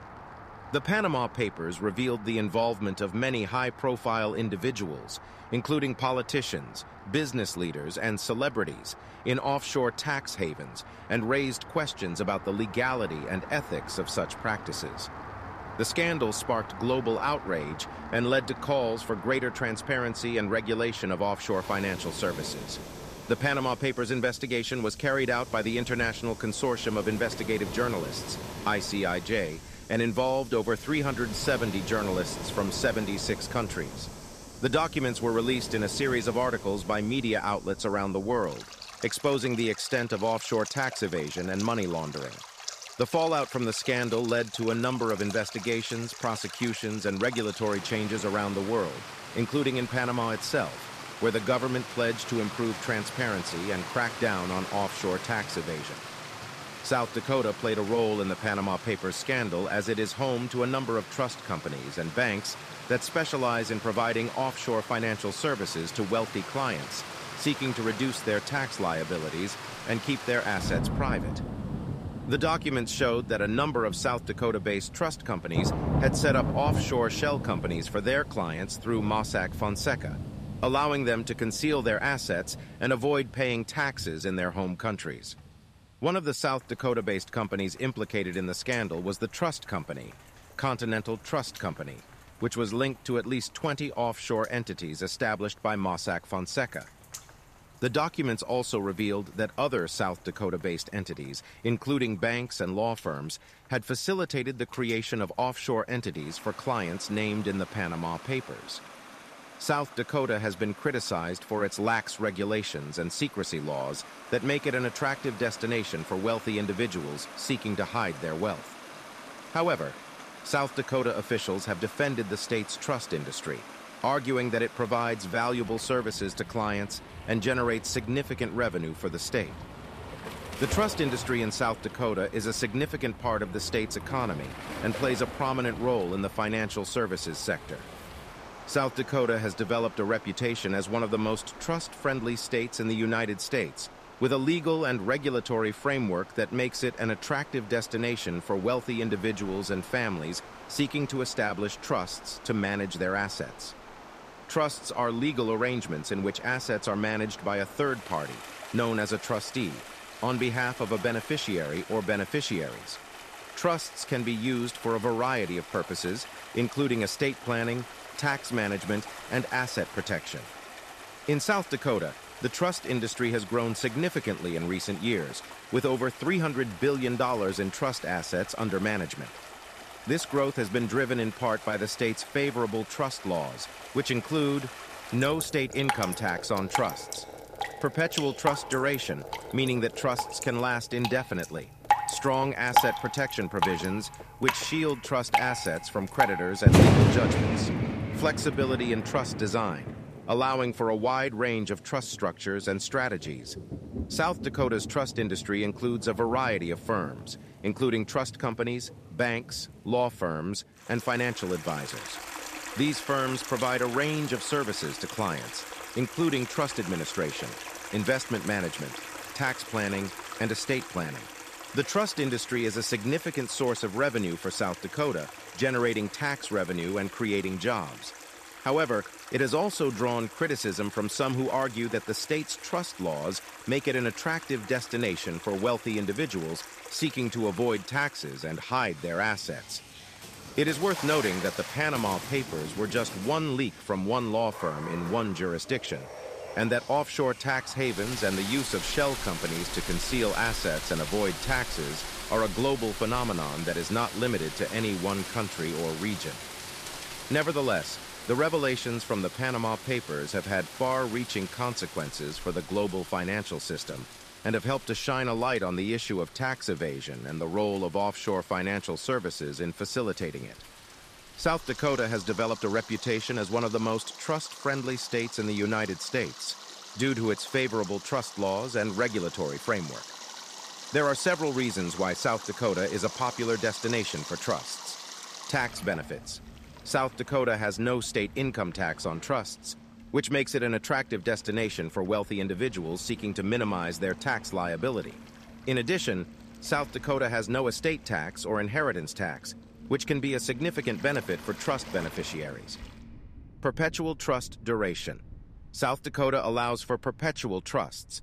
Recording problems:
rain or running water; loud; throughout; 9 dB below the speech

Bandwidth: 14.5 kHz